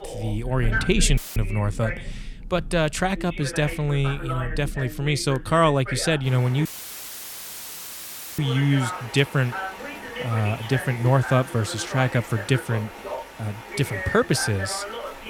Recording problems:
voice in the background; loud; throughout; 10 dB below the speech
rain or running water; noticeable; throughout; 15 dB below the speech
audio cutting out; filled with static; at 1 s and at 6.5 s for 1.5 s

